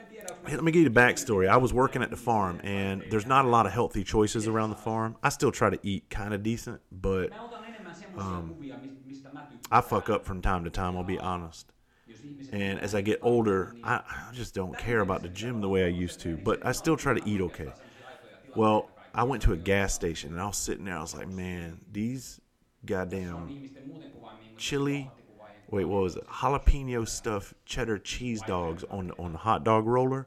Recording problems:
voice in the background; noticeable; throughout; 20 dB below the speech

